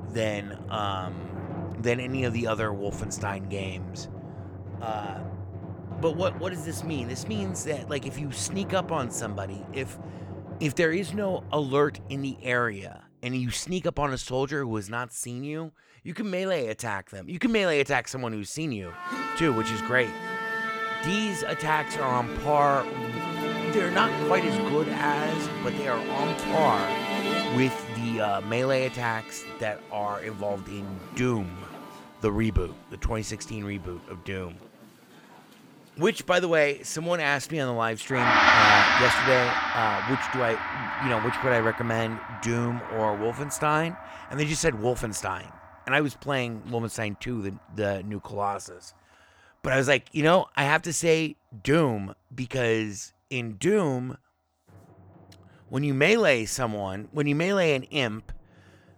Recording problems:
background music; loud; throughout; 2 dB below the speech

